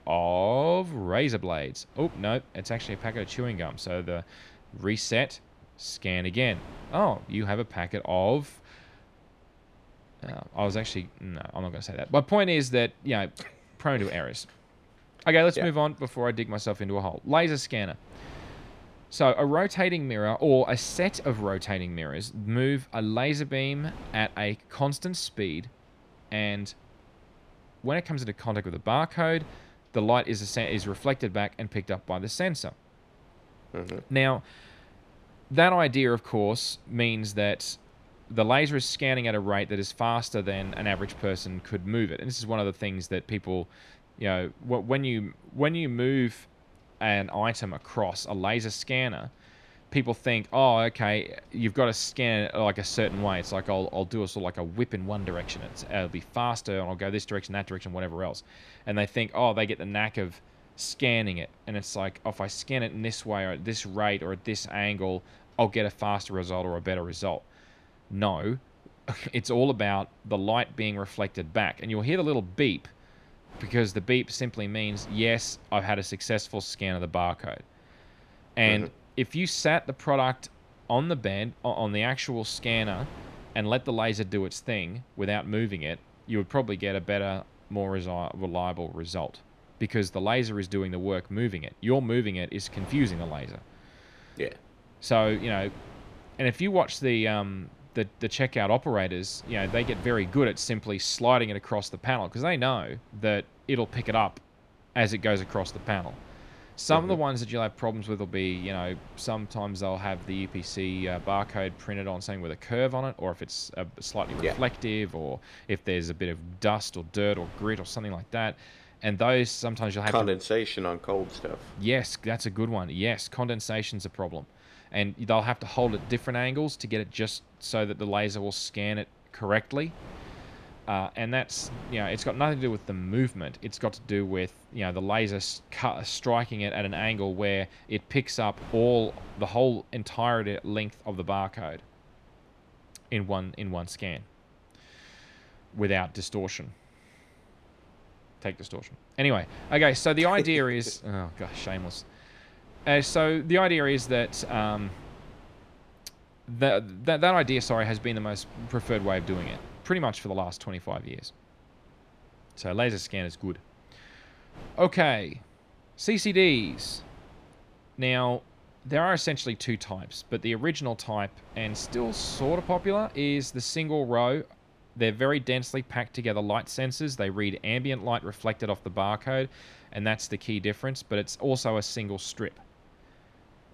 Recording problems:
wind noise on the microphone; occasional gusts; 25 dB below the speech

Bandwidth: 13.5 kHz